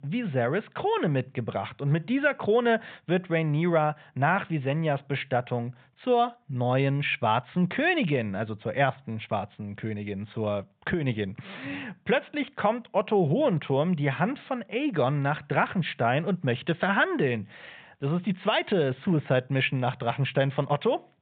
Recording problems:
high frequencies cut off; severe; nothing above 4 kHz

